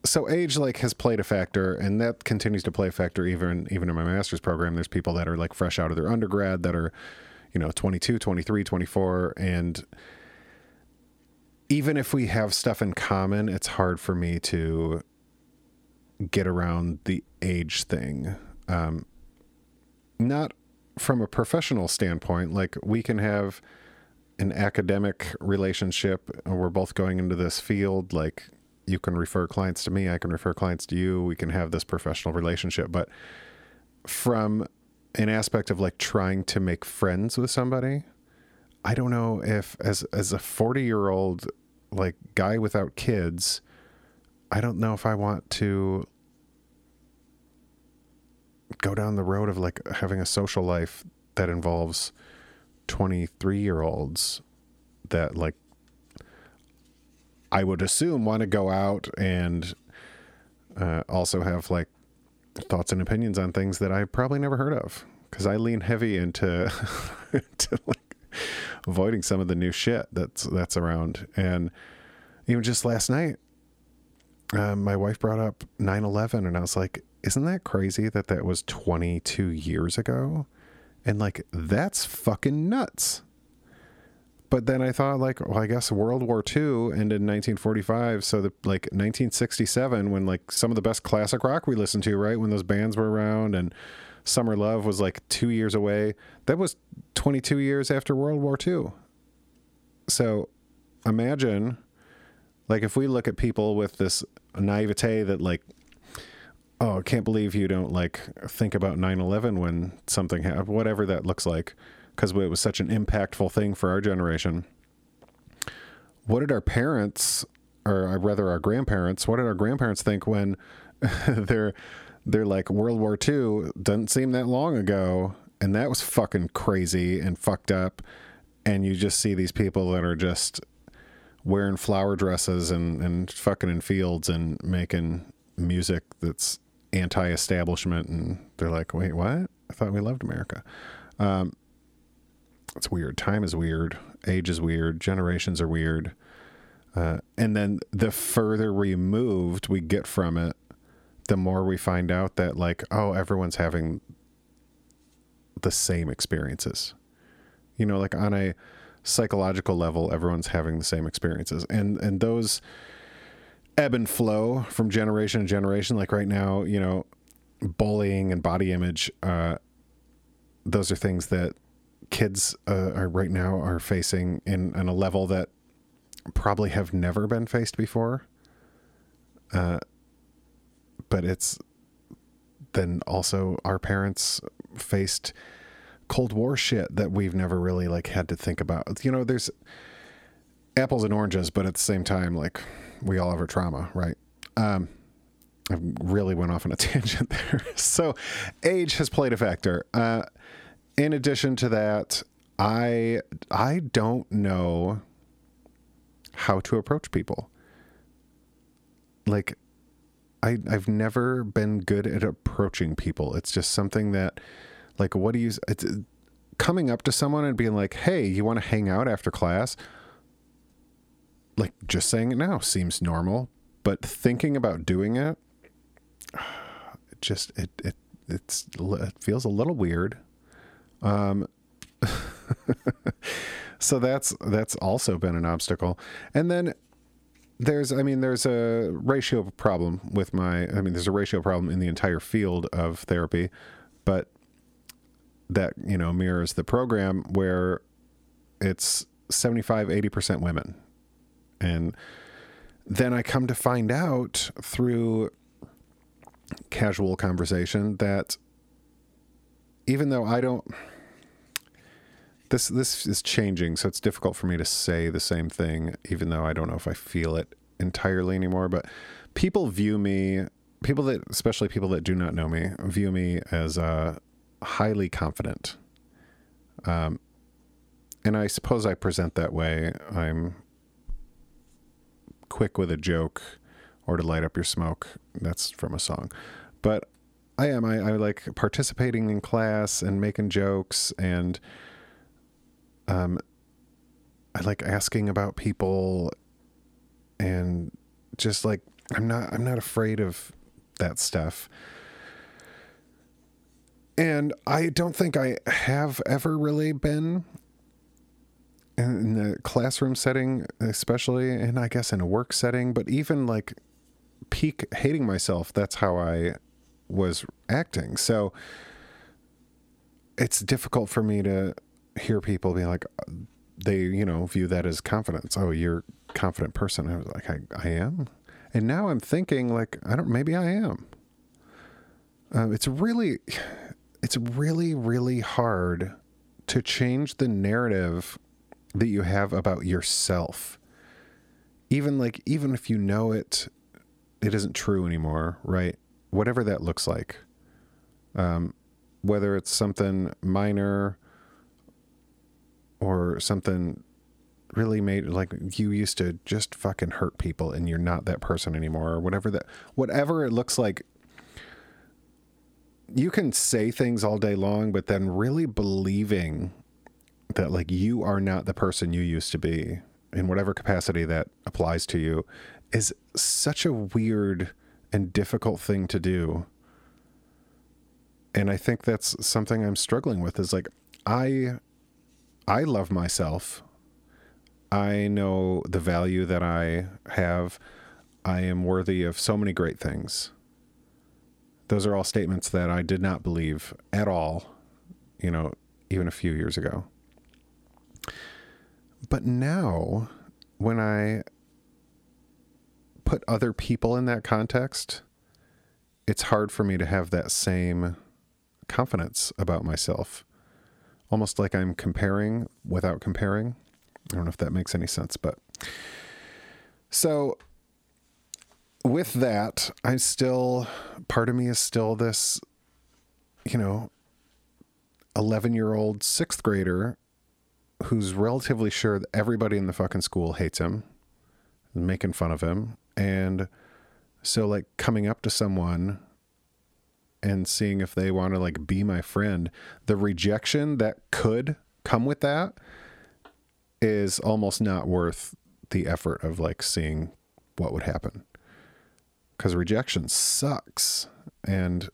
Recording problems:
squashed, flat; somewhat

